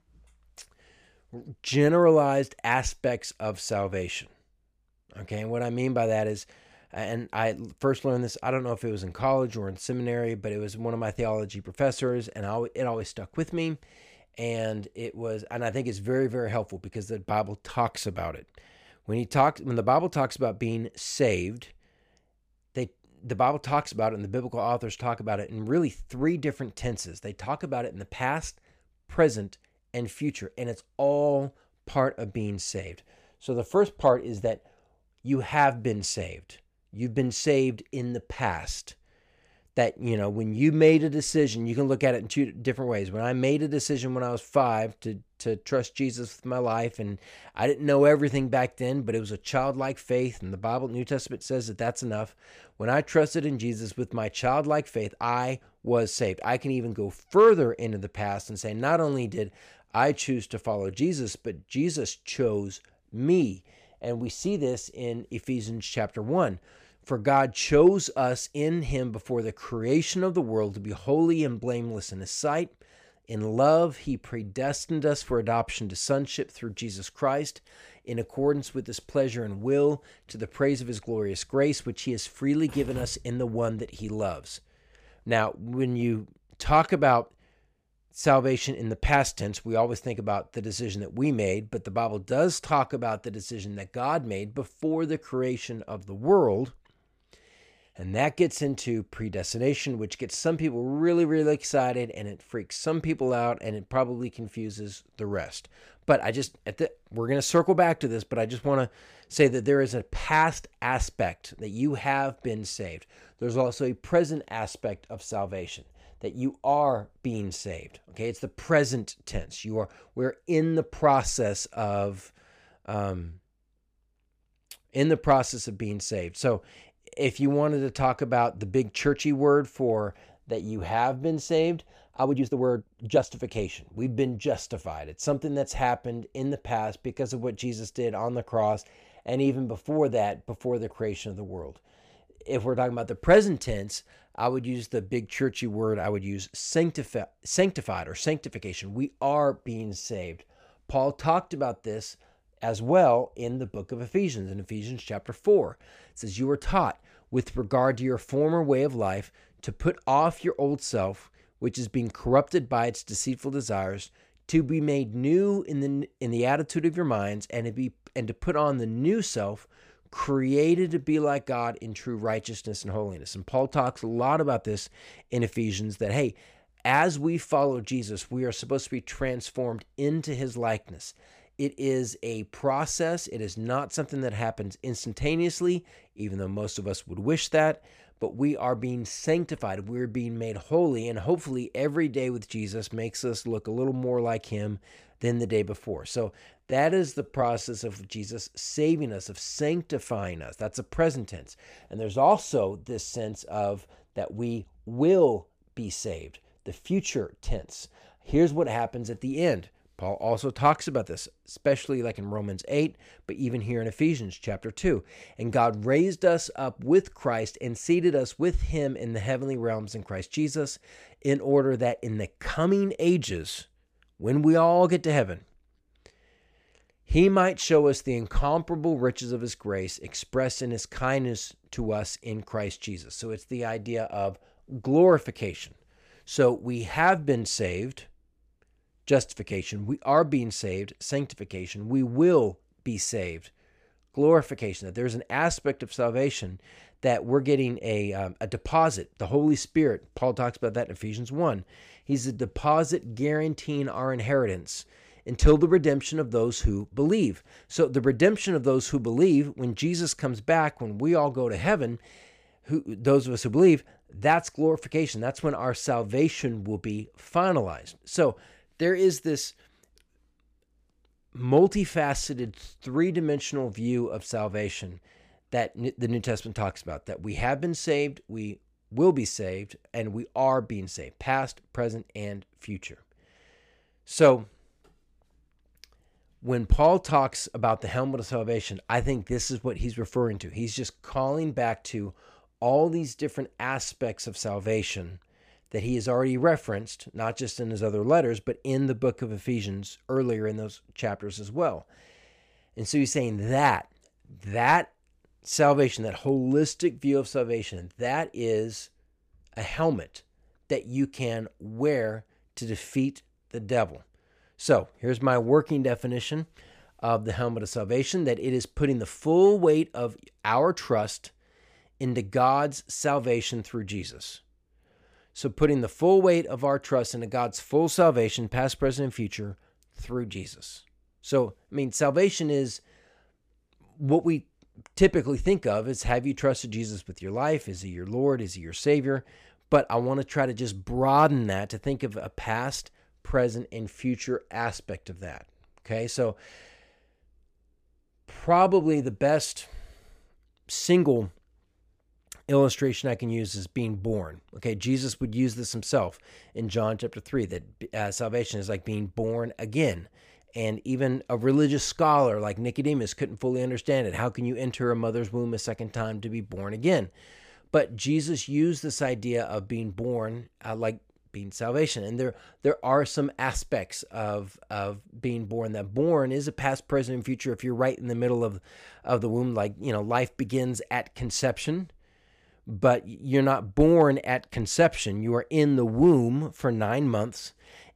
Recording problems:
uneven, jittery; strongly; from 2:12 to 3:18

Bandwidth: 15 kHz